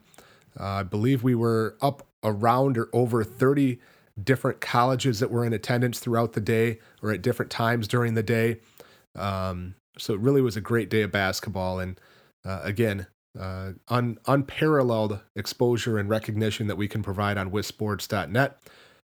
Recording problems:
none

